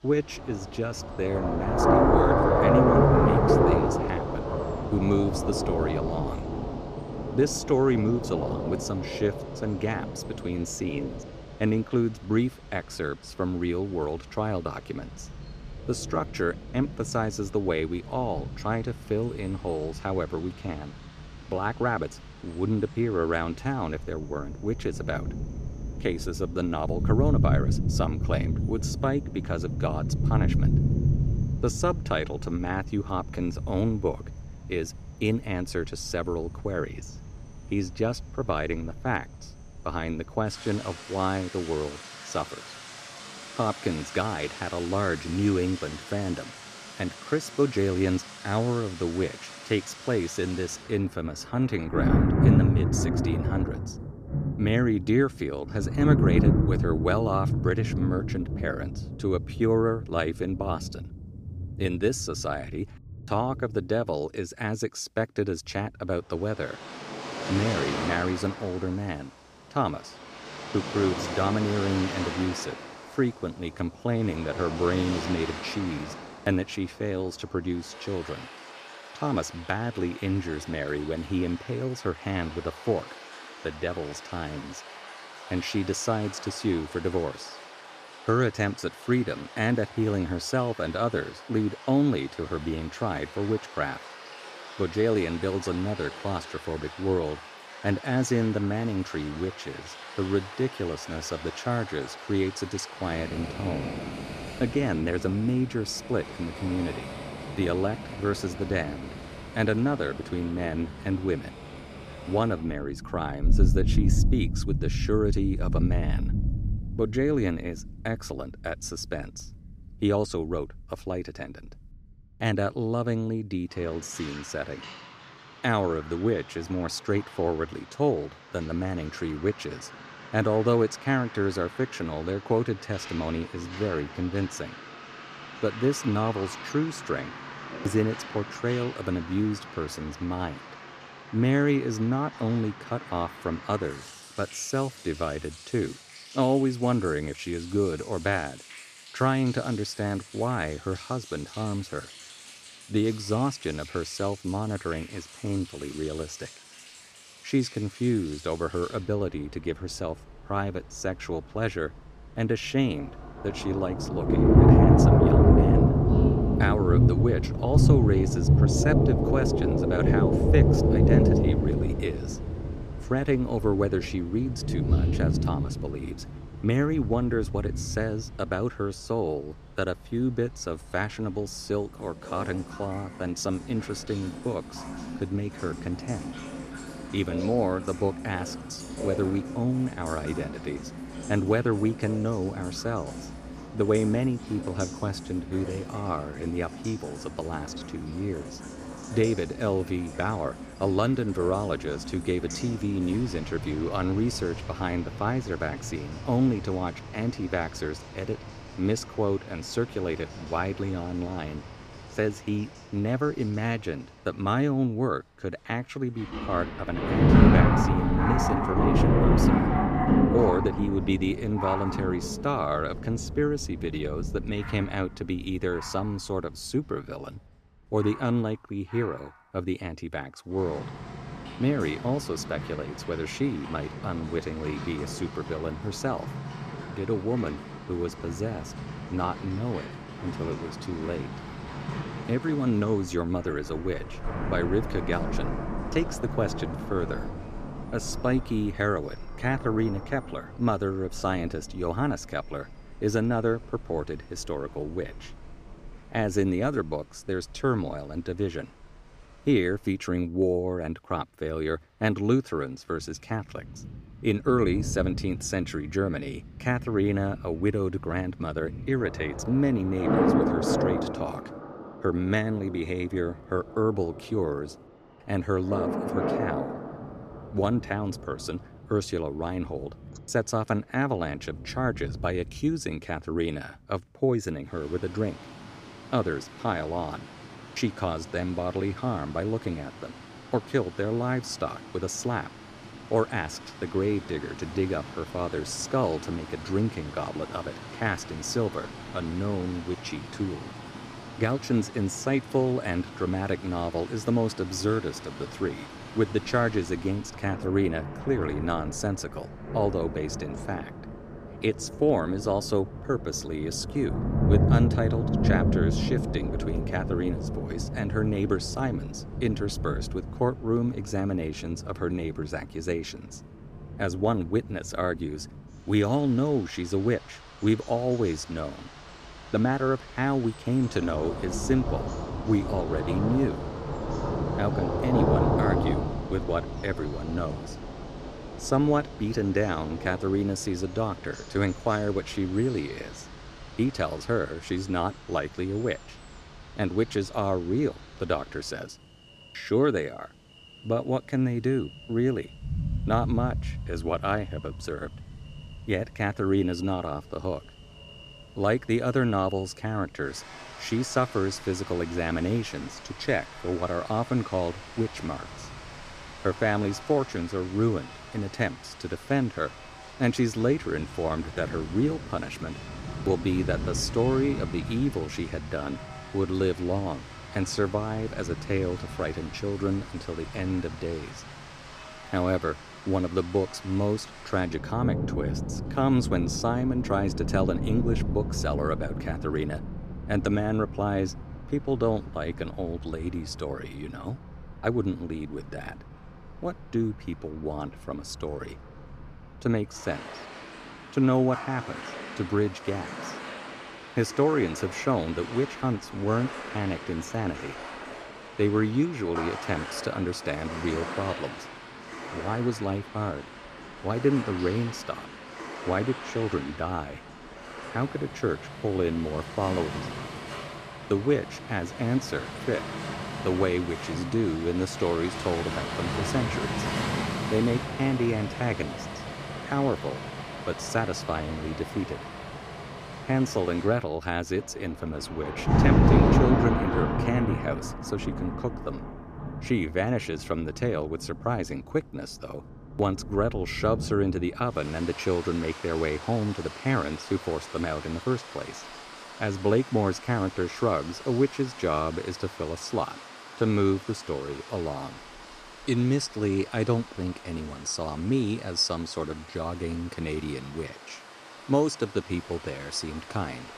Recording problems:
rain or running water; loud; throughout; 2 dB below the speech

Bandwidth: 15 kHz